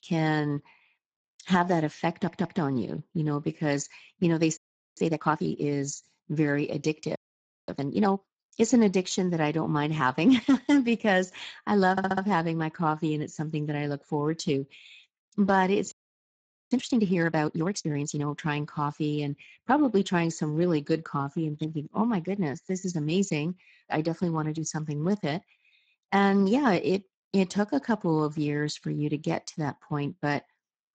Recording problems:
garbled, watery; badly; nothing above 7.5 kHz
audio stuttering; at 2 s and at 12 s
audio freezing; at 4.5 s, at 7 s for 0.5 s and at 16 s for 1 s

